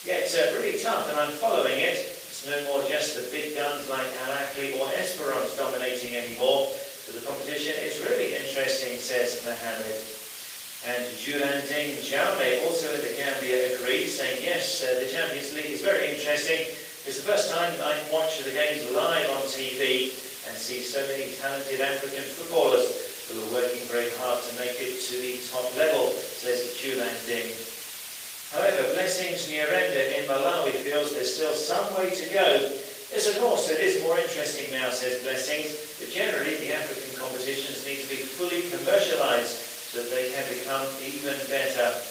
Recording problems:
off-mic speech; far
room echo; noticeable; dies away in 0.7 s
thin; somewhat; fading below 450 Hz
garbled, watery; slightly; nothing above 15.5 kHz
hiss; loud; throughout; 9 dB below the speech

